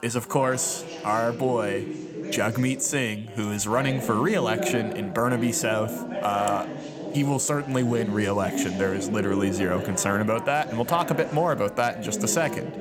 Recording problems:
background chatter; loud; throughout; 3 voices, 7 dB below the speech

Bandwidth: 18.5 kHz